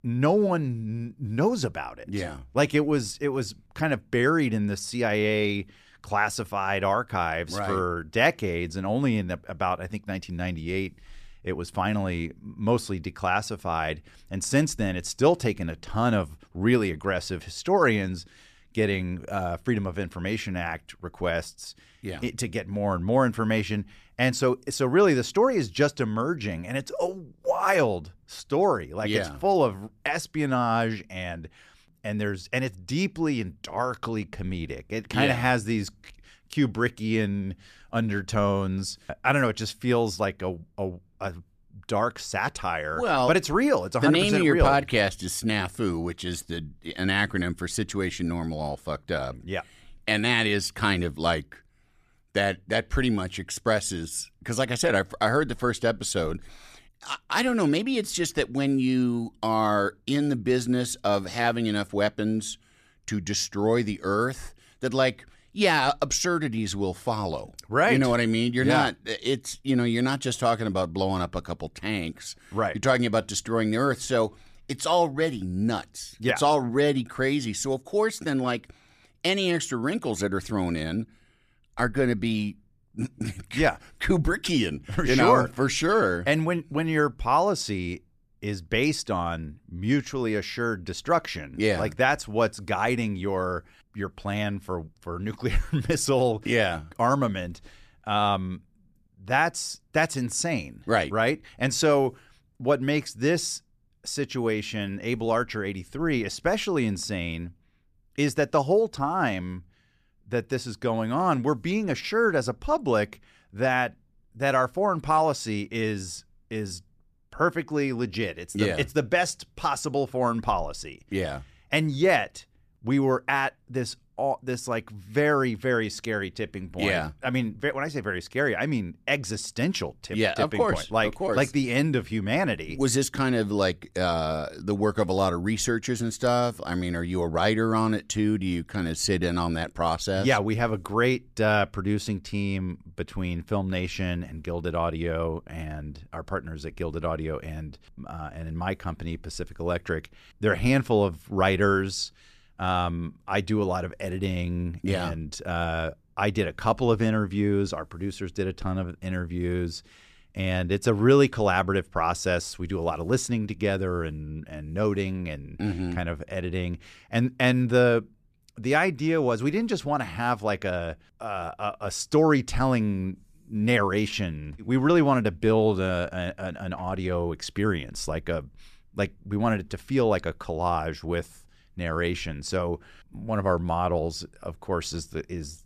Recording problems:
none

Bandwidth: 14.5 kHz